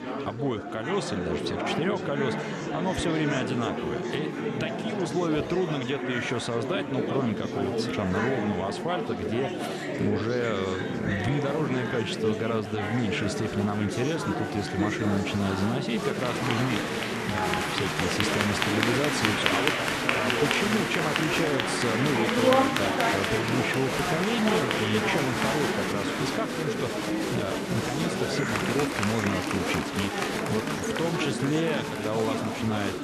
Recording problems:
murmuring crowd; very loud; throughout; 2 dB above the speech

